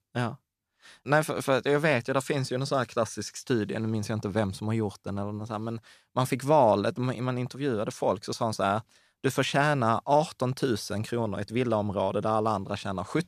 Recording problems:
none

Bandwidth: 14.5 kHz